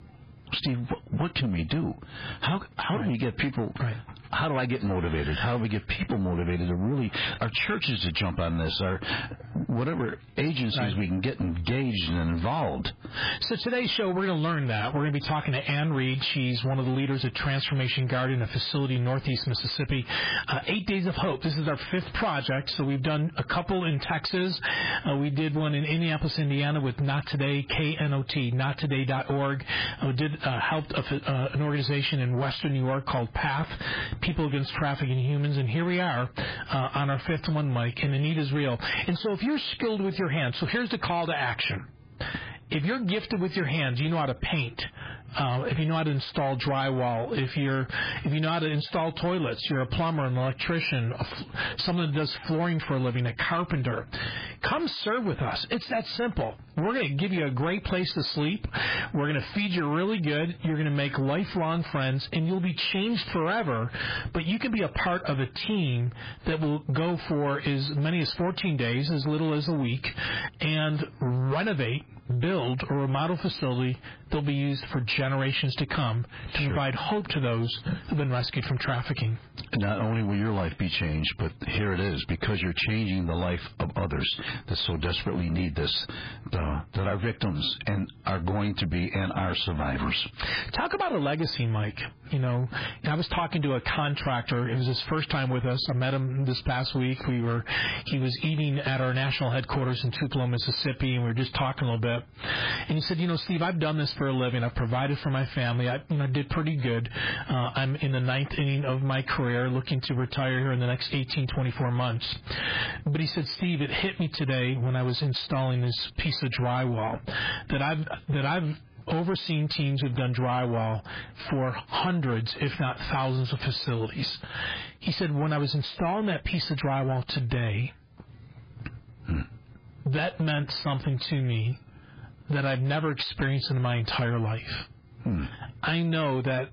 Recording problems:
garbled, watery; badly; nothing above 4 kHz
squashed, flat; heavily
distortion; slight; 10 dB below the speech

